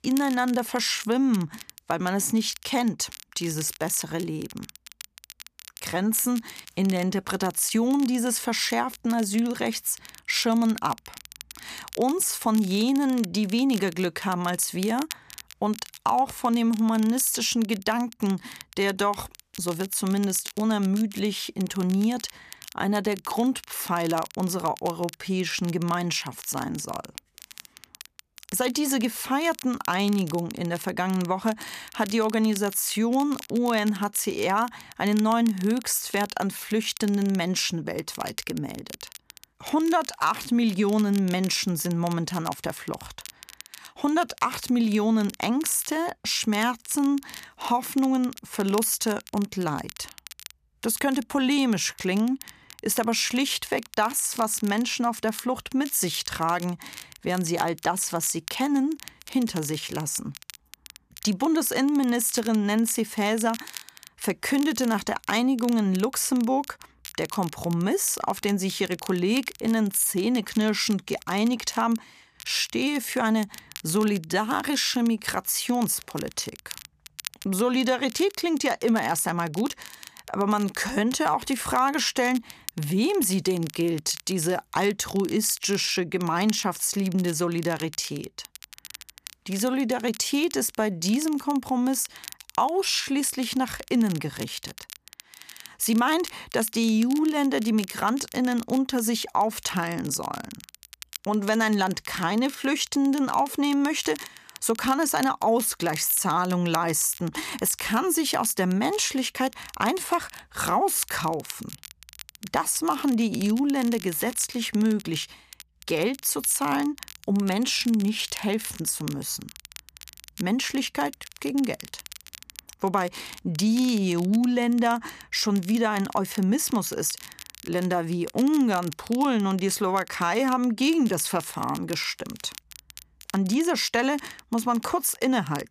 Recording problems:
crackle, like an old record; noticeable; 20 dB below the speech

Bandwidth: 14.5 kHz